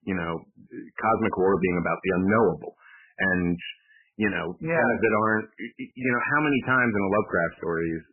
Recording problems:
garbled, watery; badly; nothing above 3 kHz
distortion; slight; 3% of the sound clipped

